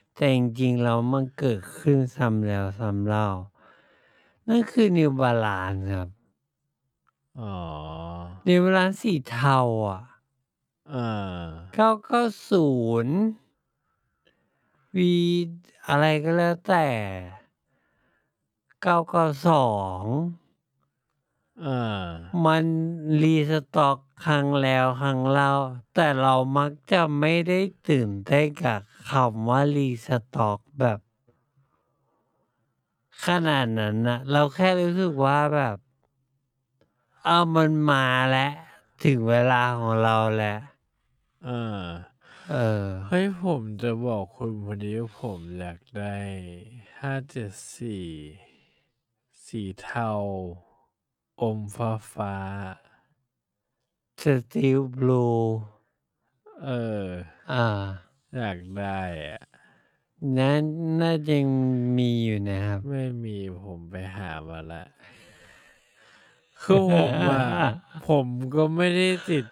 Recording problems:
wrong speed, natural pitch; too slow; 0.5 times normal speed

